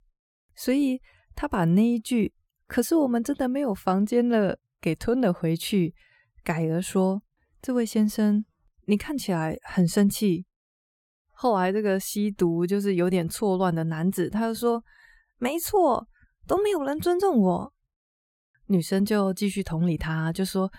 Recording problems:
none

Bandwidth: 17.5 kHz